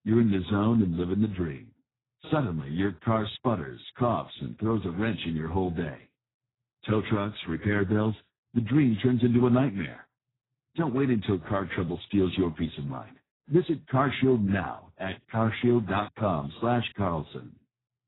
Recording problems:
garbled, watery; badly; nothing above 4 kHz

